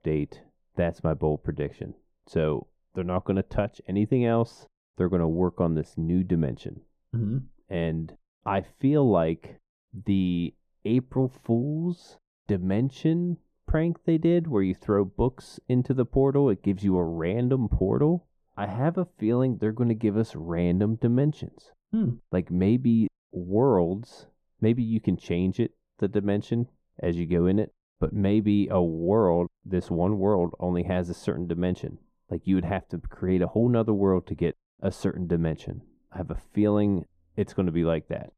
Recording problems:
muffled; very; fading above 1.5 kHz

